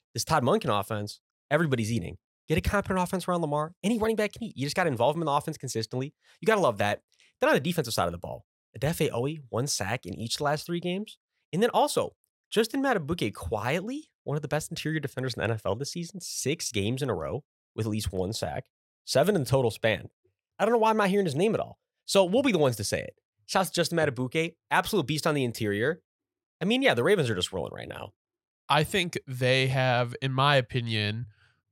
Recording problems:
none

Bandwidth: 16 kHz